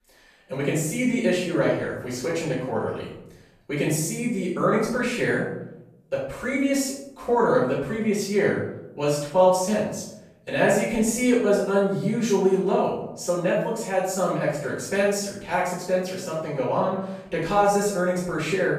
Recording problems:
off-mic speech; far
room echo; noticeable; dies away in 0.7 s

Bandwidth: 14.5 kHz